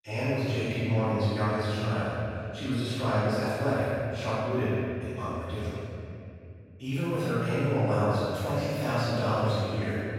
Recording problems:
room echo; strong; dies away in 2.7 s
off-mic speech; far

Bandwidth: 16 kHz